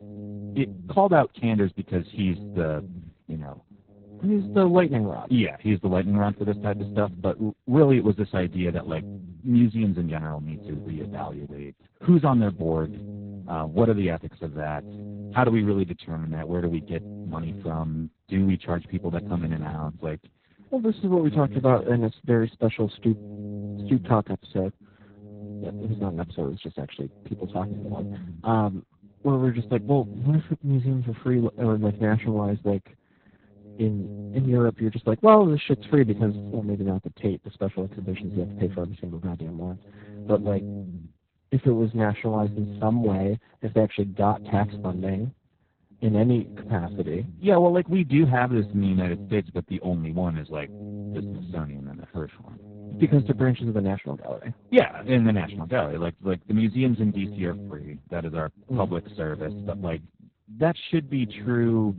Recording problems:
garbled, watery; badly
electrical hum; noticeable; throughout; 60 Hz, 20 dB below the speech

